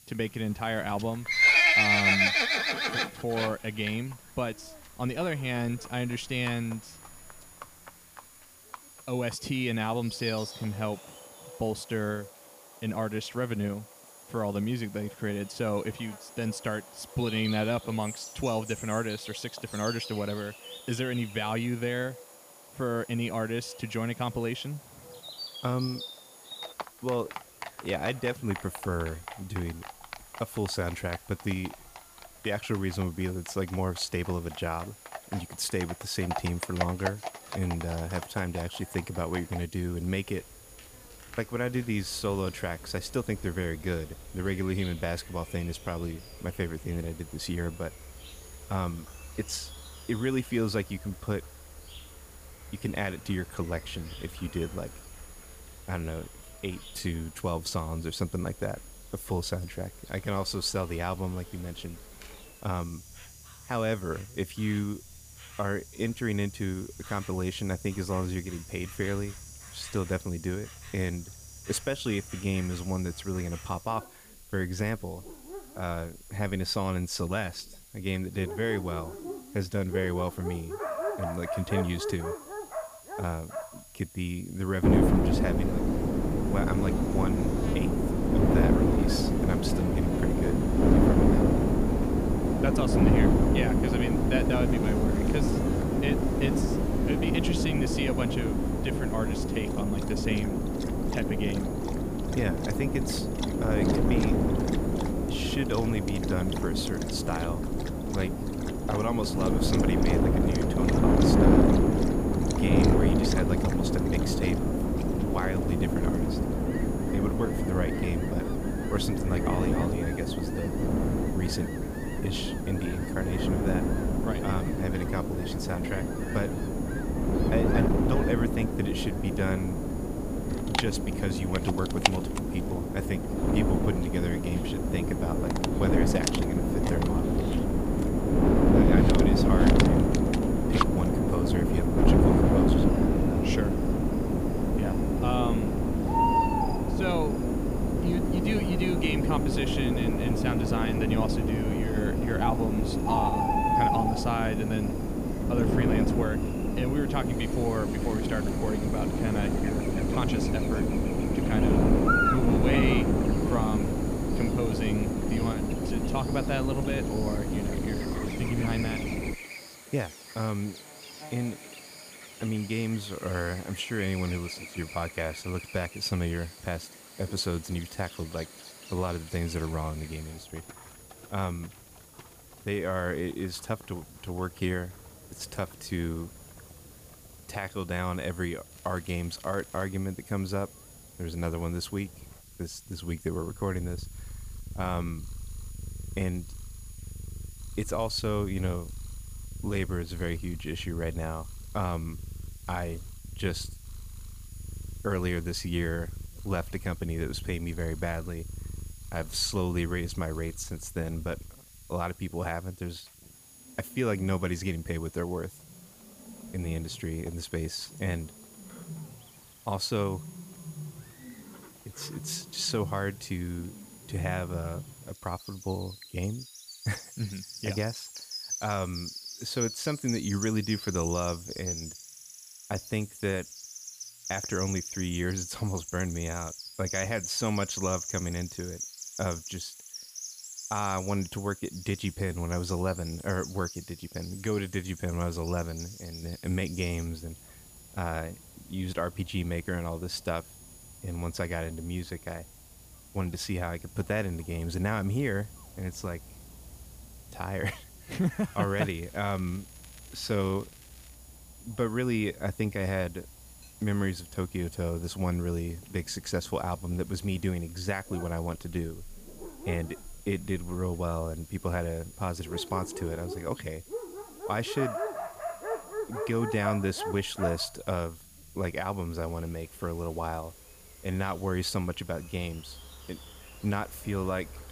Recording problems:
wind noise on the microphone; heavy; from 1:25 to 2:49; 3 dB above the speech
animal sounds; loud; throughout; 4 dB below the speech
high-pitched whine; faint; throughout; 10.5 kHz, 20 dB below the speech
hiss; faint; throughout; 20 dB below the speech
crackling; faint; at 2:38, from 3:09 to 3:10 and from 4:19 to 4:21; 25 dB below the speech

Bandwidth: 15 kHz